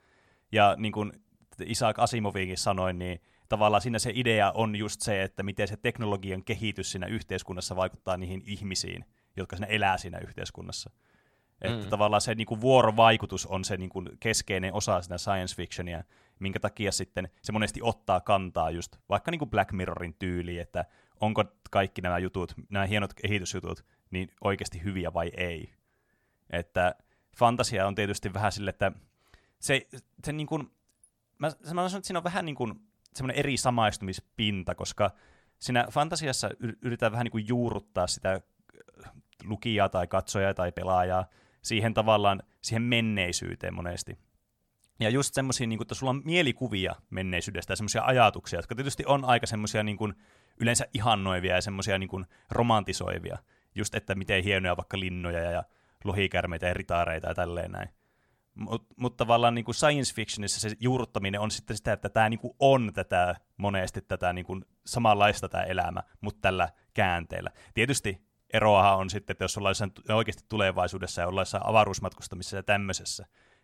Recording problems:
none

